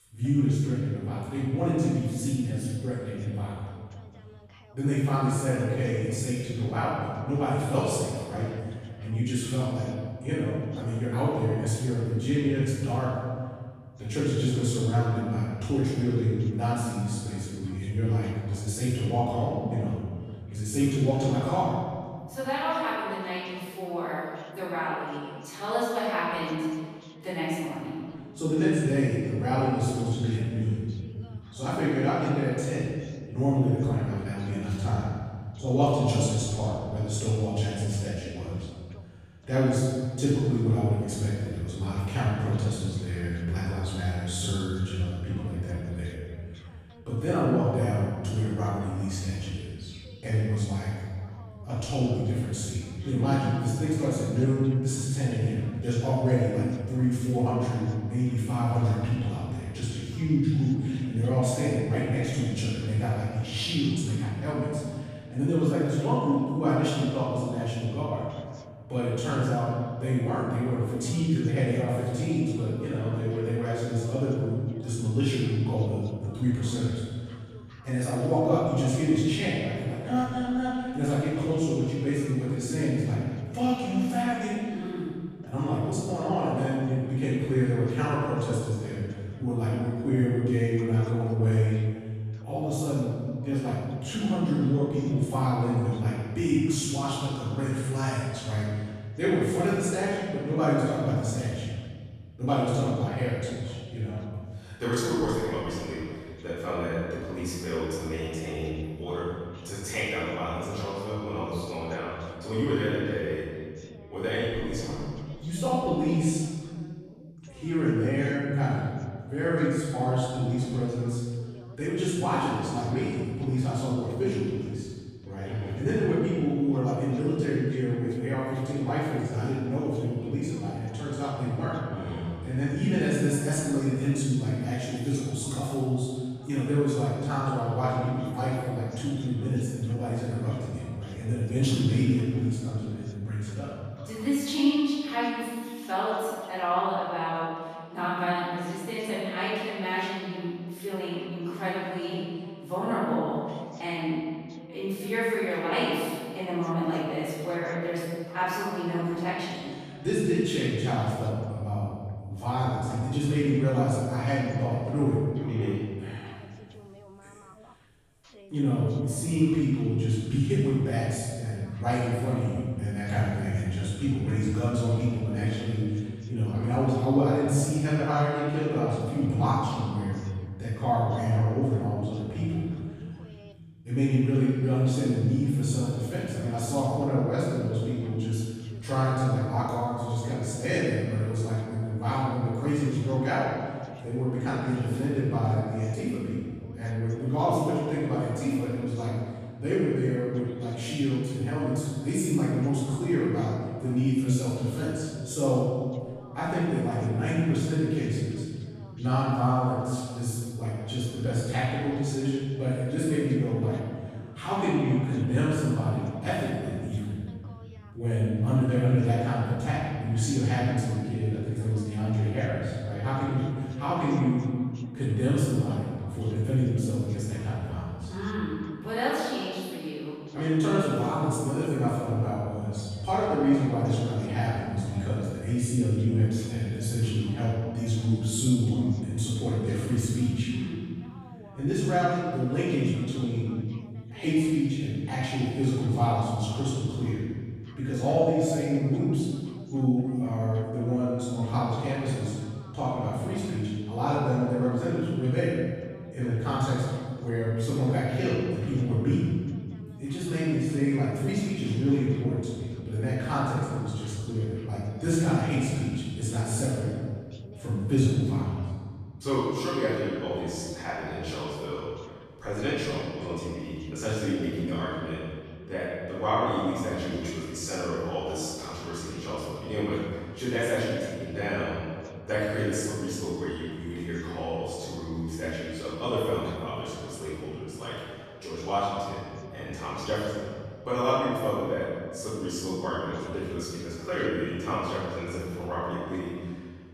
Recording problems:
room echo; strong; dies away in 1.7 s
off-mic speech; far
voice in the background; faint; throughout; 25 dB below the speech

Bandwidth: 14.5 kHz